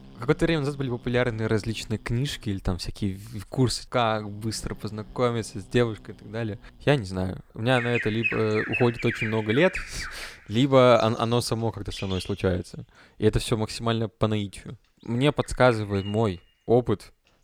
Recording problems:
animal sounds; loud; throughout; 8 dB below the speech

